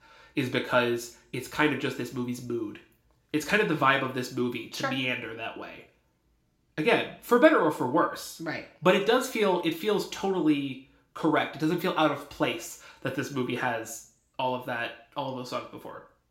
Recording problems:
room echo; very slight; dies away in 0.4 s
off-mic speech; somewhat distant

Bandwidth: 16 kHz